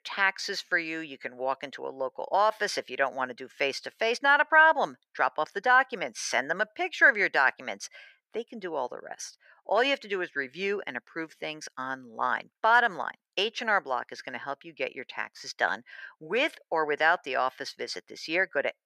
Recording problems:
thin; very; fading below 600 Hz

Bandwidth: 15 kHz